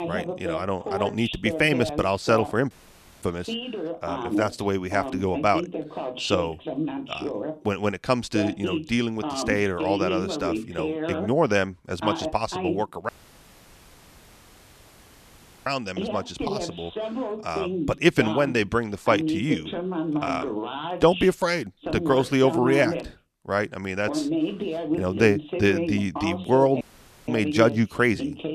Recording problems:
voice in the background; loud; throughout; 5 dB below the speech
audio cutting out; at 2.5 s for 0.5 s, at 13 s for 2.5 s and at 27 s

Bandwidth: 14 kHz